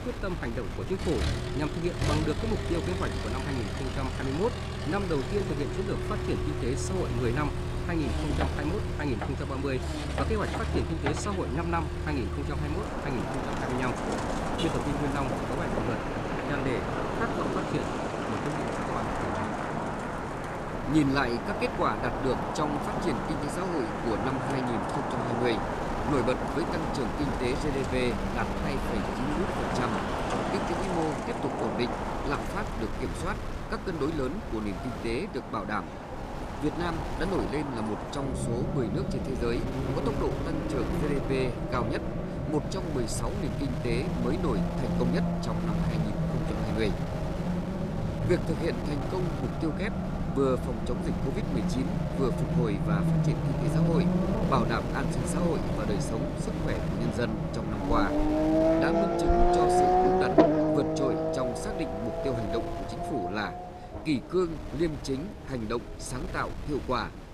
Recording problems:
traffic noise; very loud; throughout; 2 dB above the speech
wind noise on the microphone; occasional gusts; 10 dB below the speech
rain or running water; very faint; throughout; 25 dB below the speech

